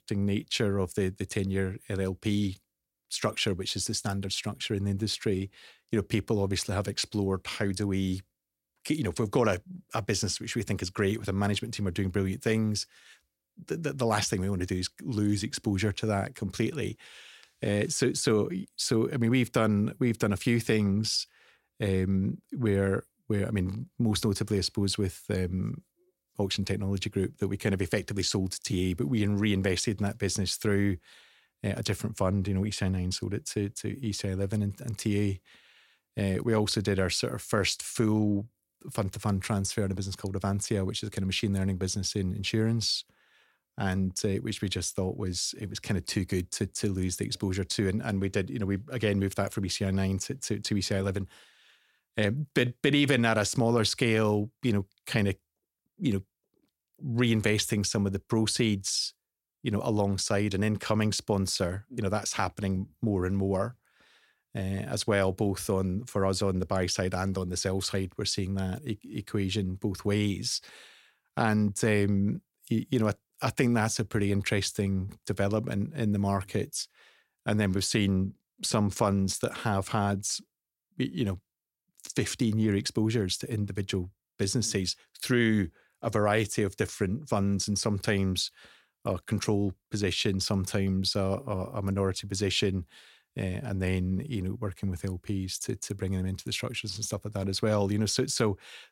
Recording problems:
none

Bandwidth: 16.5 kHz